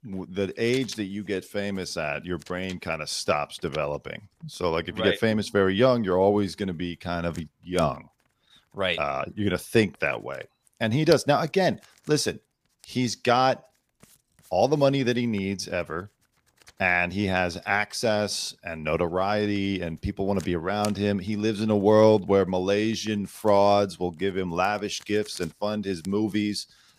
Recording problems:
household noises; faint; throughout; 25 dB below the speech

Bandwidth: 15 kHz